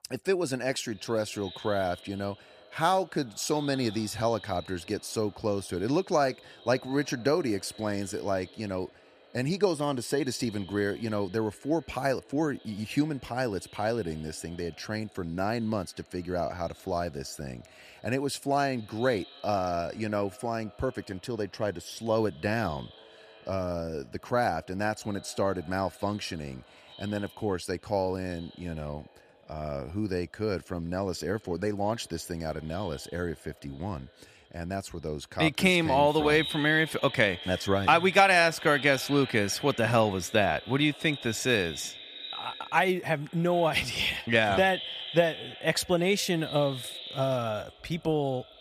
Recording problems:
echo of what is said; noticeable; throughout; 210 ms later, 15 dB below the speech

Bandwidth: 14.5 kHz